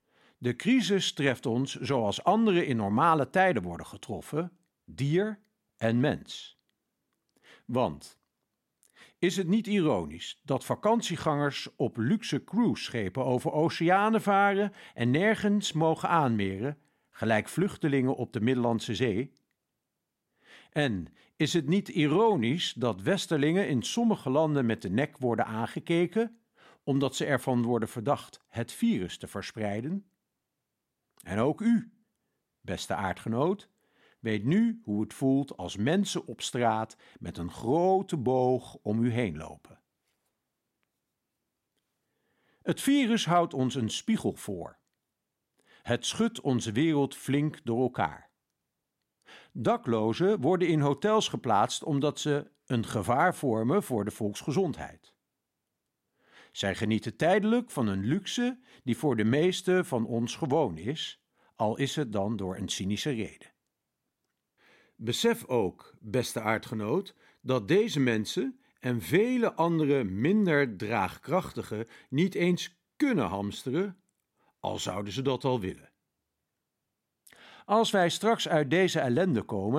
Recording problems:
abrupt cut into speech; at the end

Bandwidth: 16 kHz